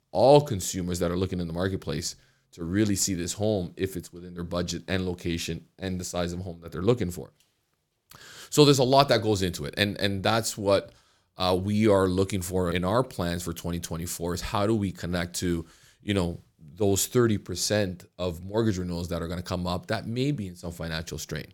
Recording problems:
none

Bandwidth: 17.5 kHz